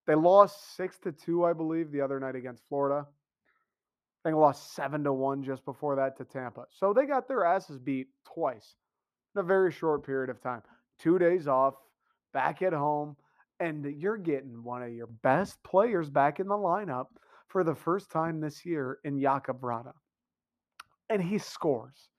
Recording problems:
muffled; very; fading above 2 kHz

